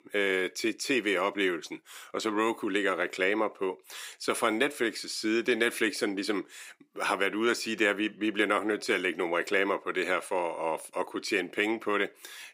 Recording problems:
thin; somewhat; fading below 300 Hz

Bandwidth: 15.5 kHz